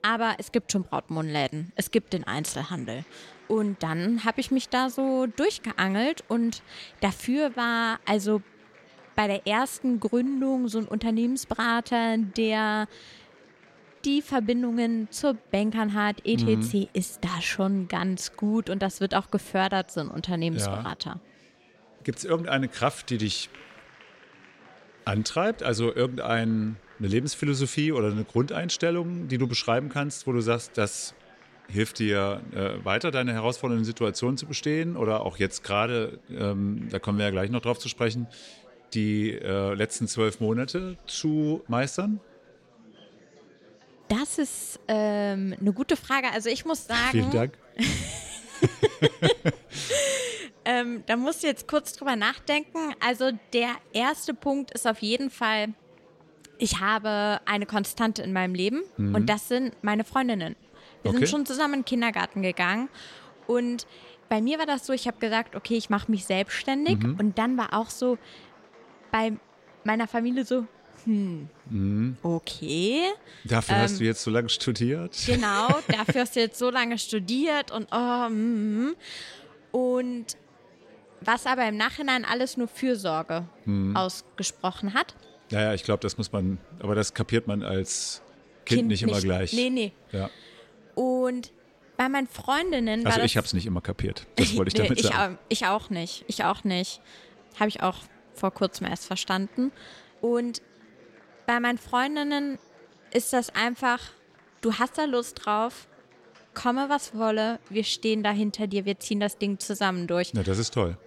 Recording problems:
chatter from many people; faint; throughout; 25 dB below the speech

